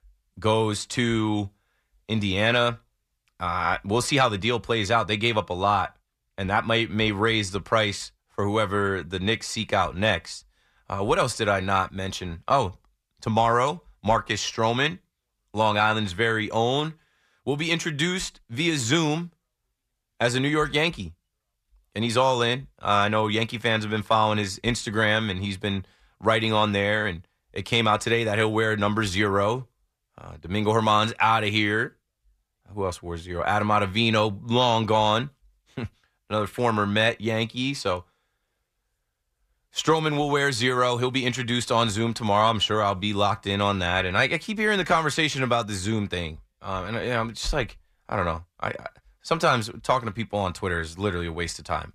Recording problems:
none

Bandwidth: 14.5 kHz